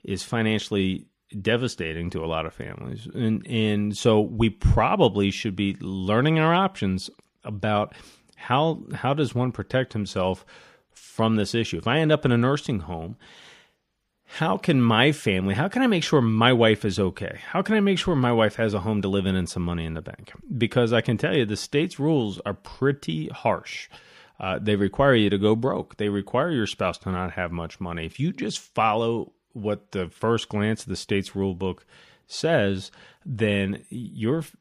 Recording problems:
none

